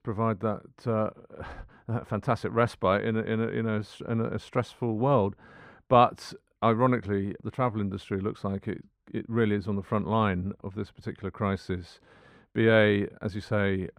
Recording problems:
muffled; very; fading above 3 kHz

